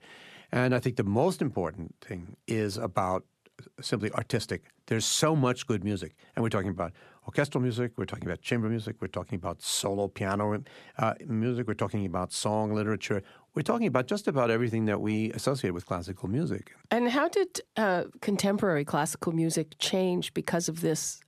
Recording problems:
none

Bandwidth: 14 kHz